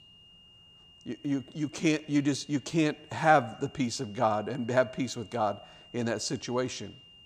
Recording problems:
high-pitched whine; faint; throughout; 3 kHz, 25 dB below the speech

